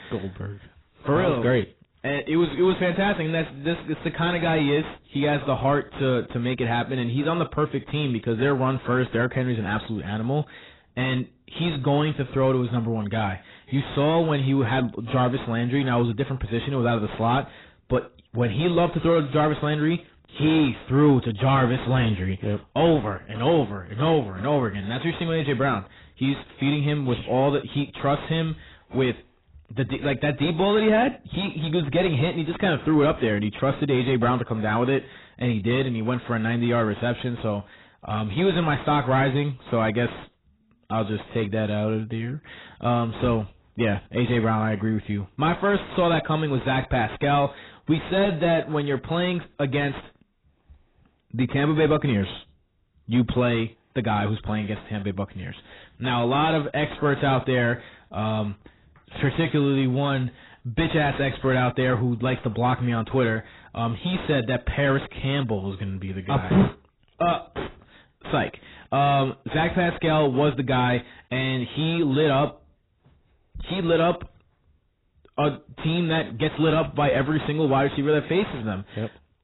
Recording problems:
distortion; heavy; 5 dB below the speech
garbled, watery; badly; nothing above 4 kHz

